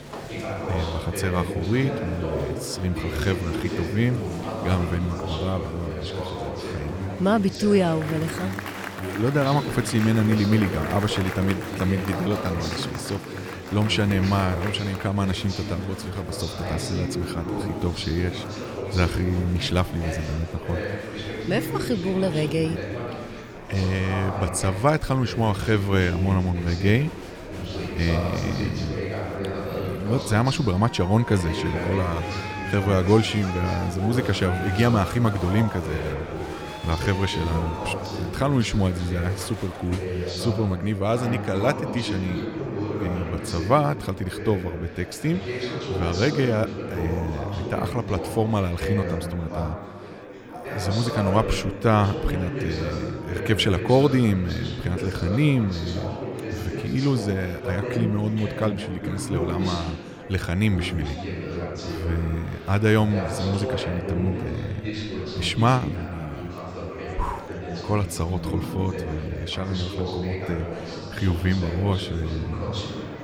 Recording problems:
murmuring crowd; loud; throughout; 6 dB below the speech

